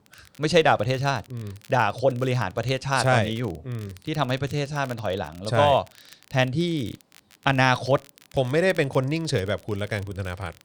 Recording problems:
crackle, like an old record; faint; 25 dB below the speech

